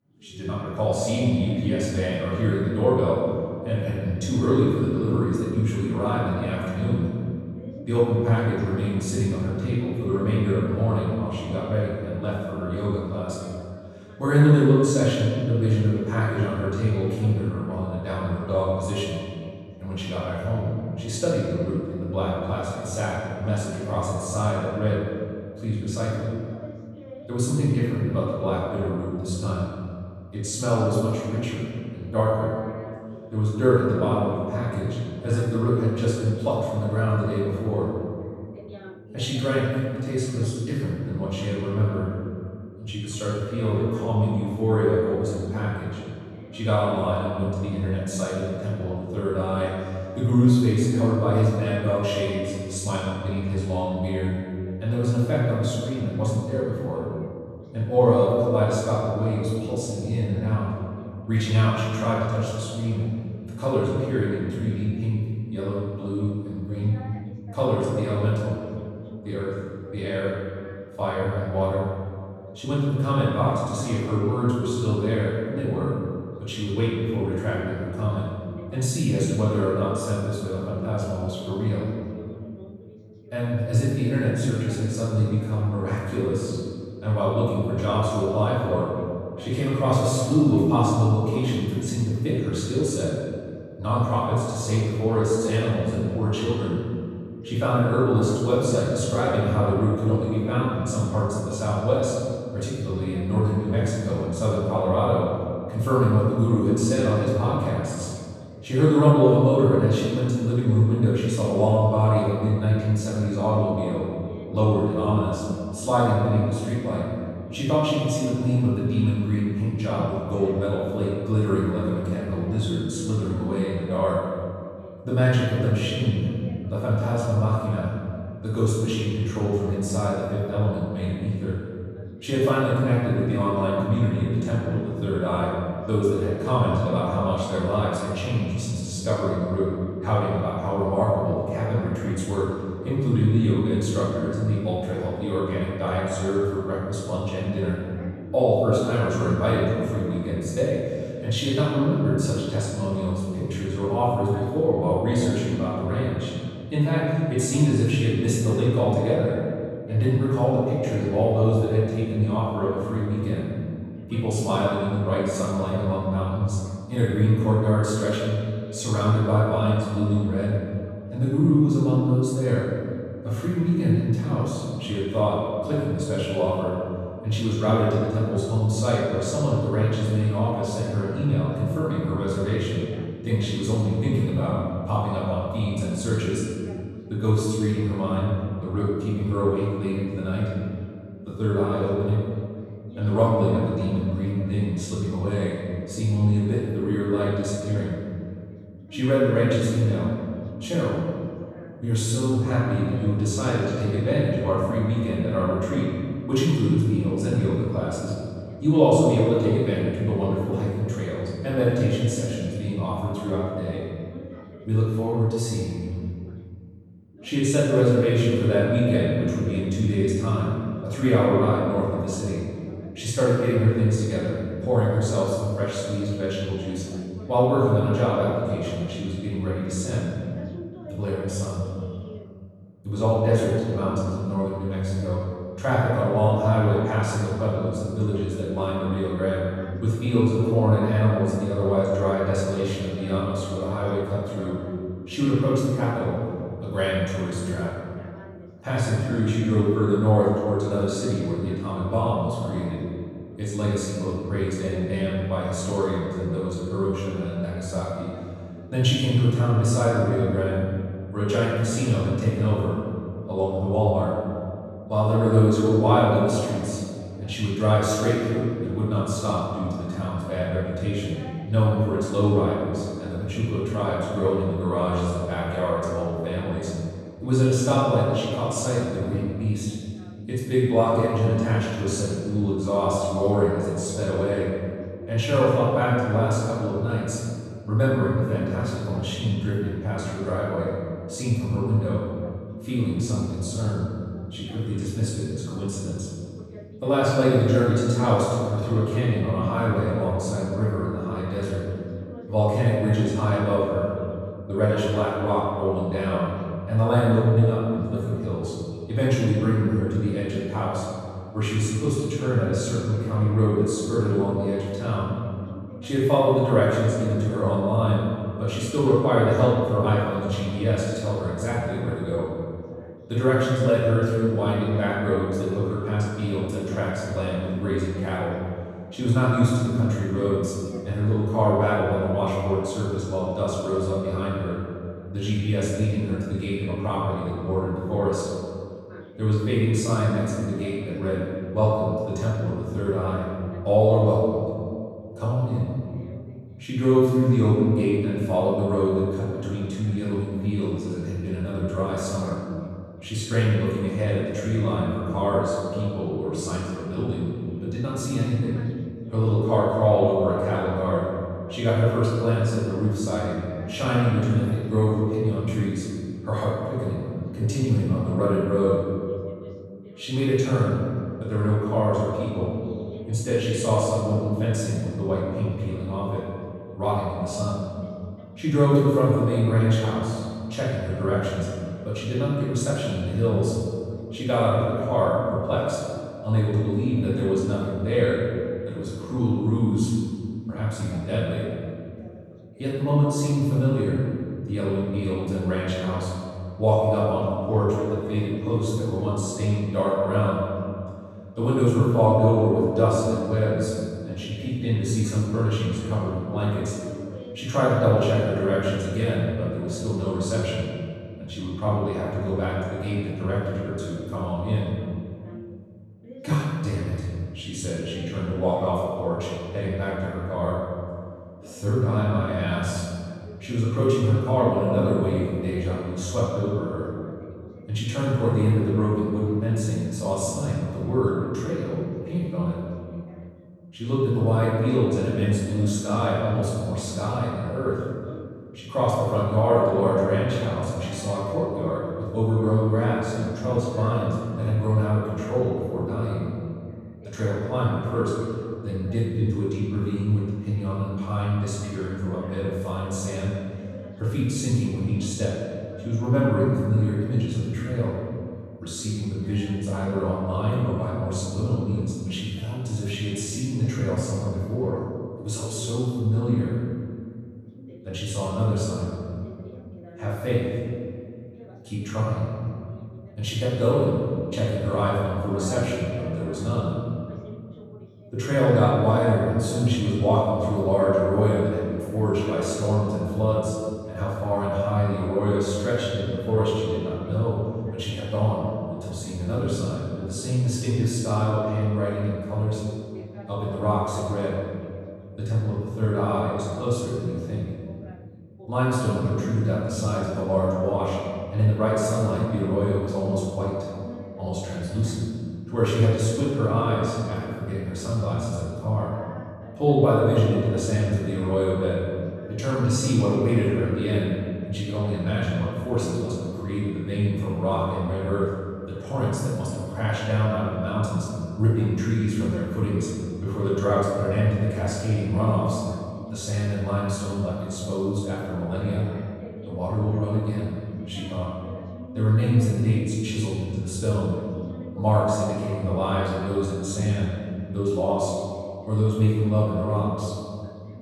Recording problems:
room echo; strong; dies away in 2.1 s
off-mic speech; far
voice in the background; faint; throughout; 20 dB below the speech

